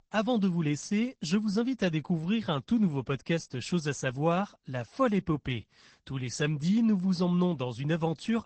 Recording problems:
high frequencies cut off; noticeable; nothing above 8 kHz
garbled, watery; slightly

